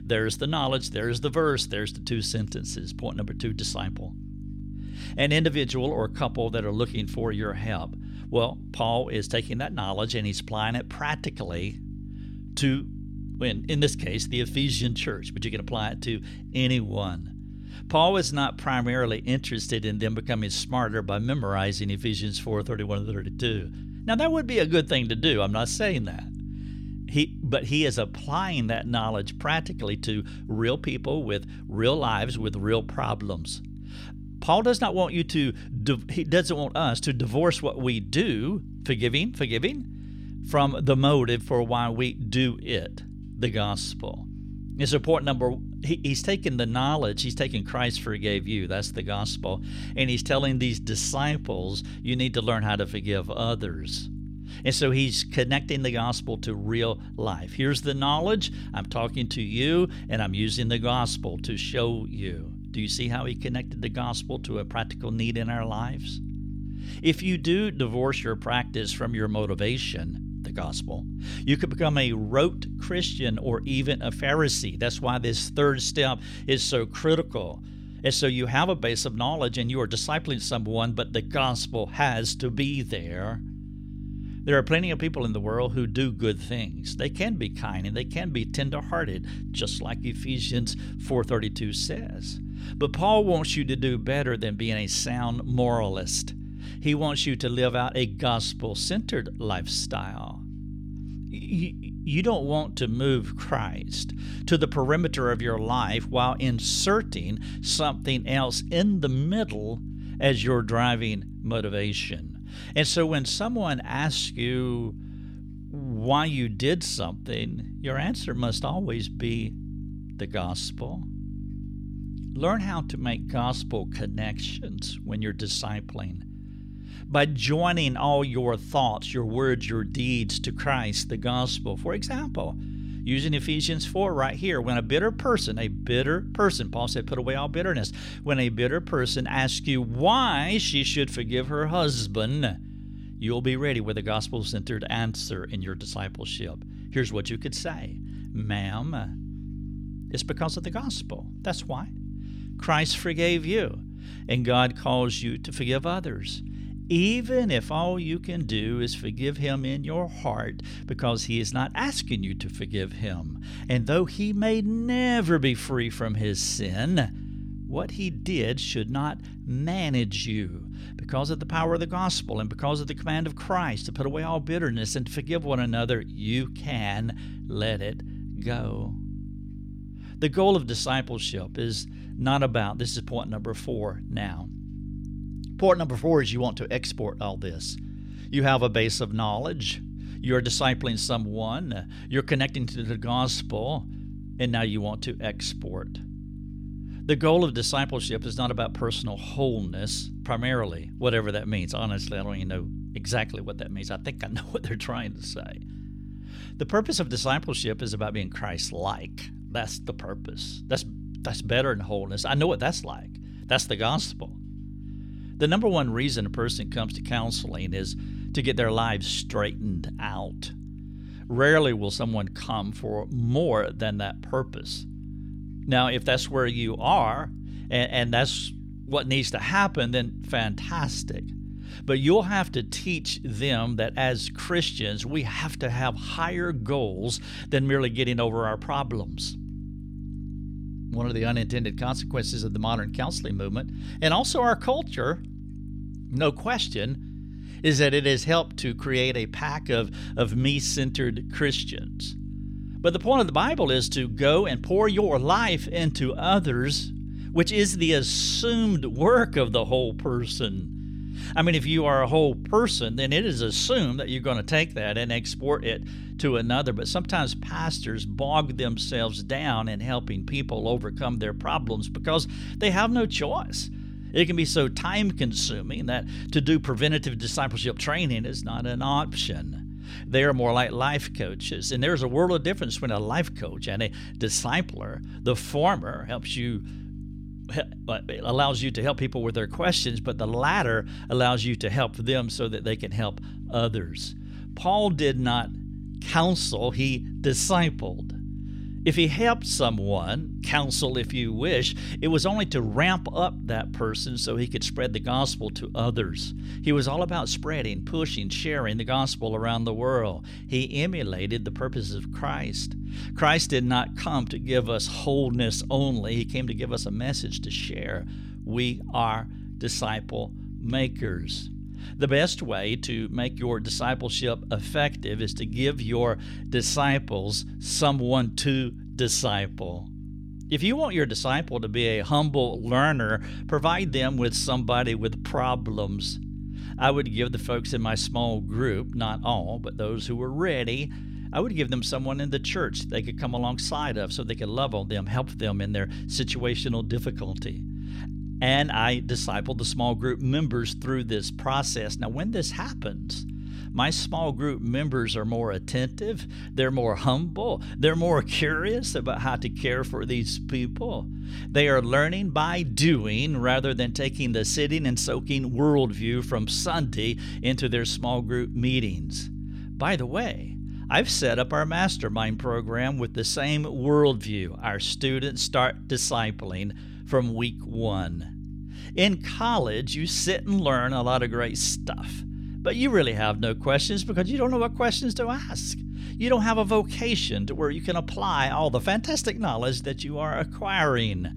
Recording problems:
electrical hum; noticeable; throughout; 50 Hz, 20 dB below the speech

